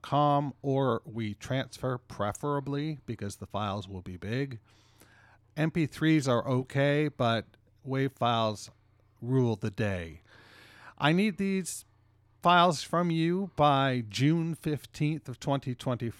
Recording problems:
none

